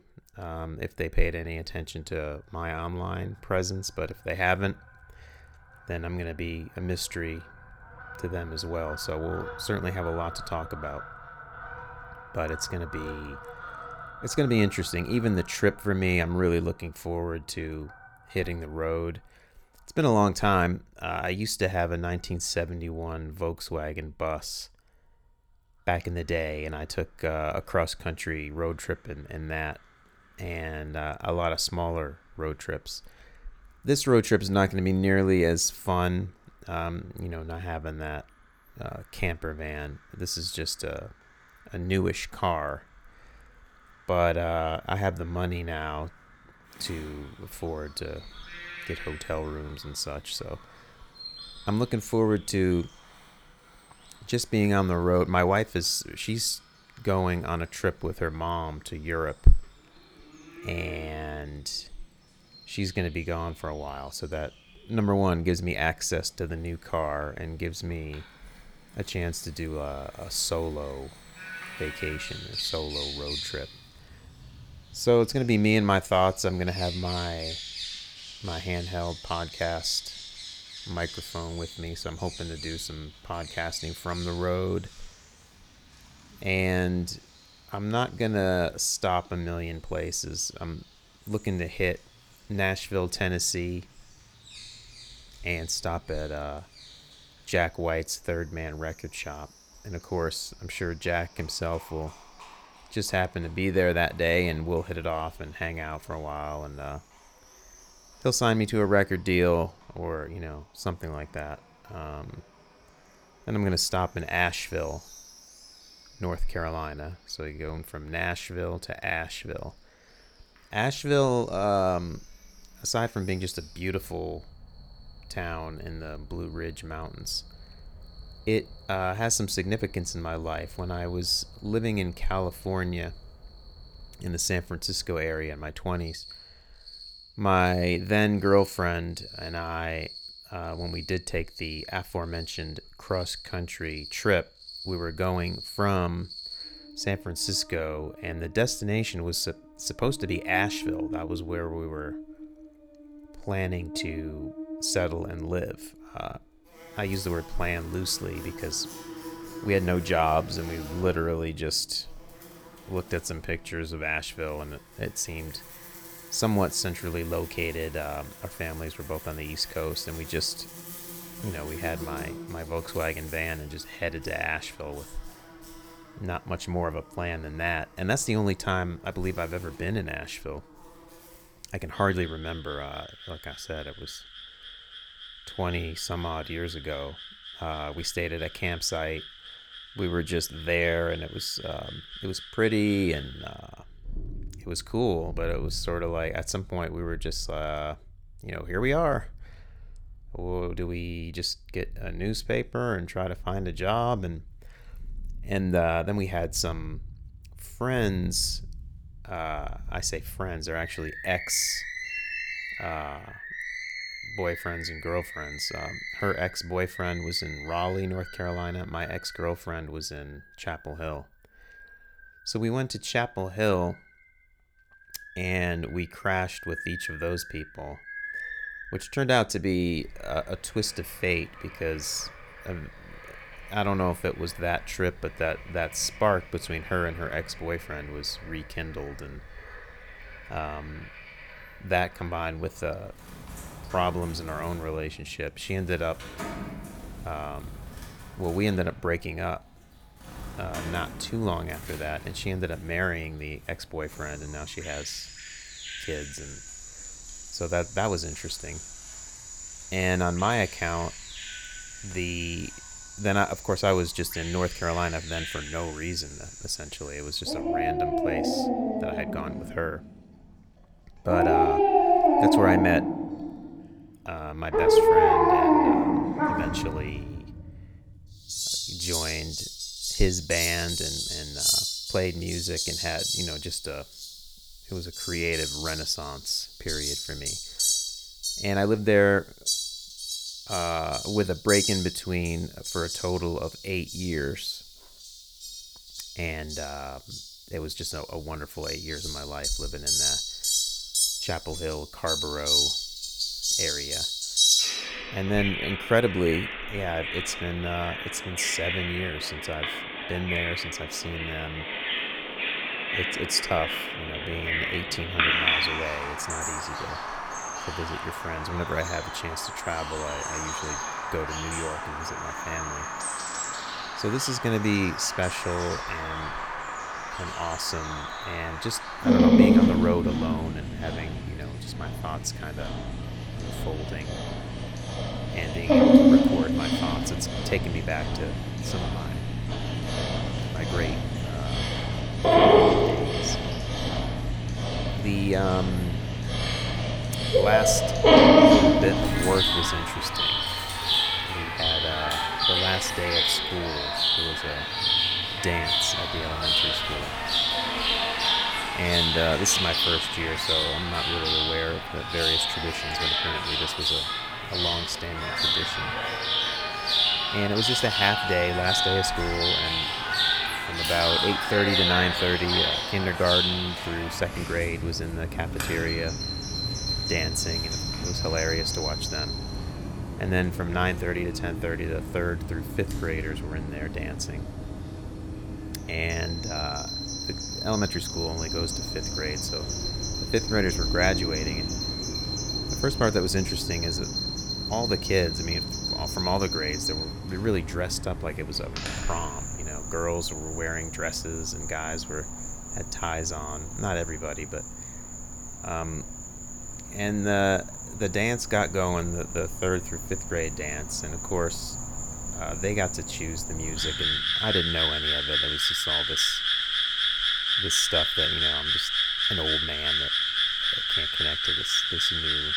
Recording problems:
animal sounds; very loud; throughout; 3 dB above the speech

